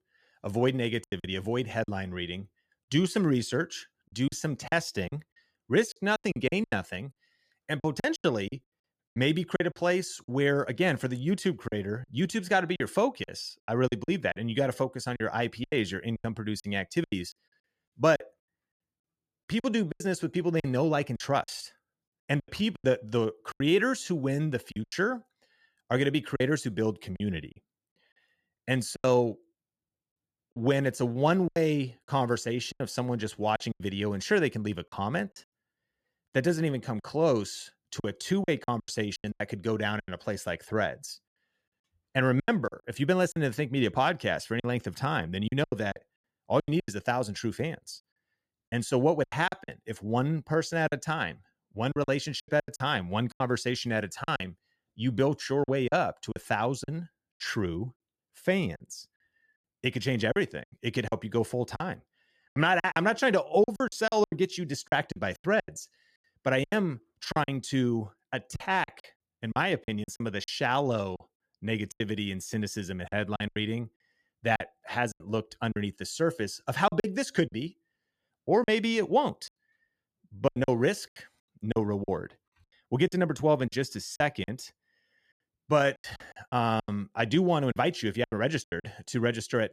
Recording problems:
choppy; very; 11% of the speech affected

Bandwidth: 14.5 kHz